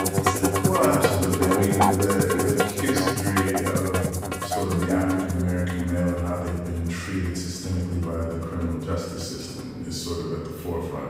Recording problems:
room echo; strong; dies away in 1.3 s
off-mic speech; far
background music; very loud; throughout; 3 dB above the speech
chatter from many people; faint; throughout; 25 dB below the speech

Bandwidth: 15.5 kHz